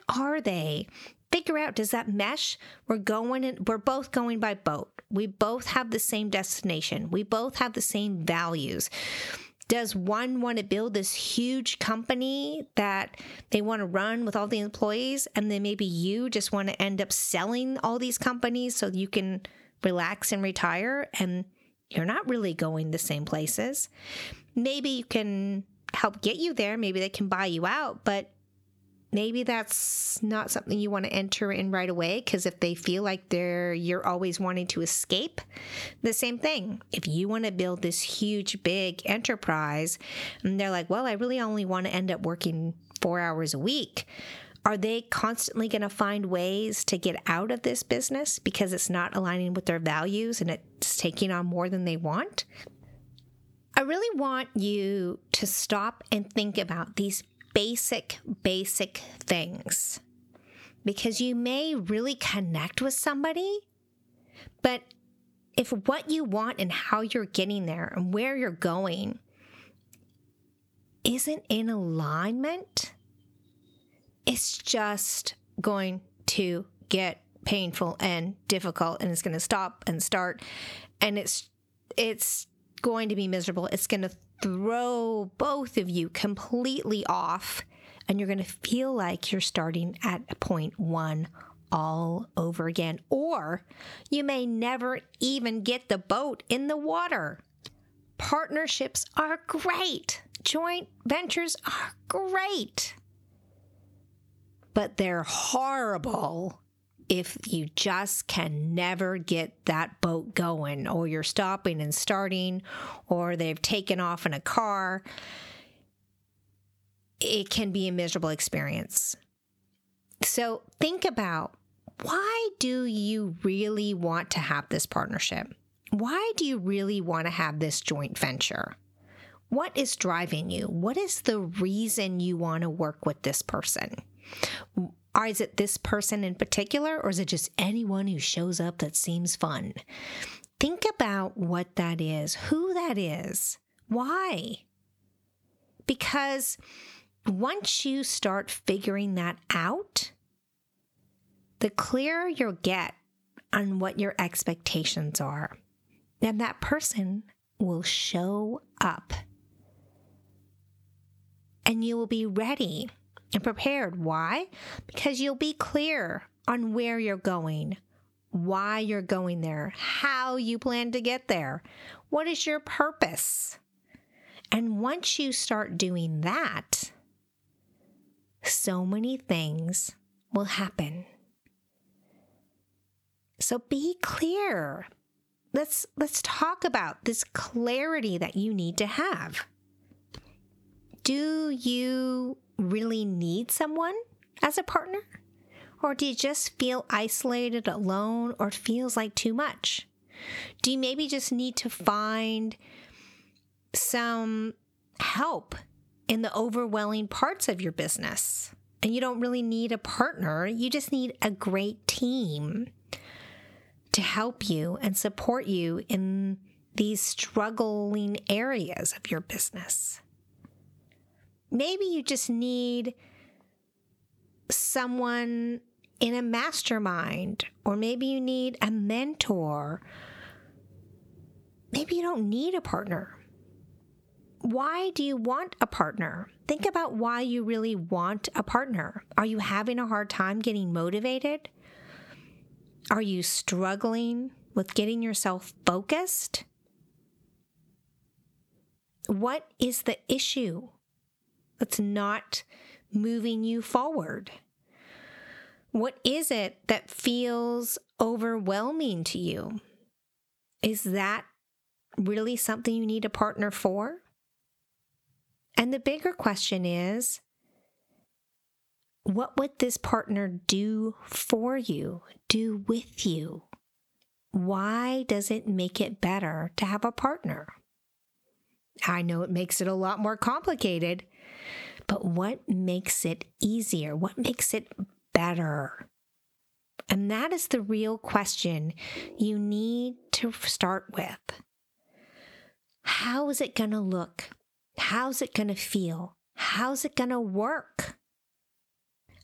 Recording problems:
squashed, flat; heavily

